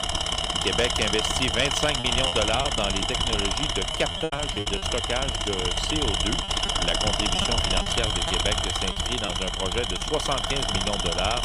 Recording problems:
machinery noise; very loud; throughout; 4 dB above the speech
choppy; very; from 2 to 5 s and from 6.5 to 10 s; 9% of the speech affected

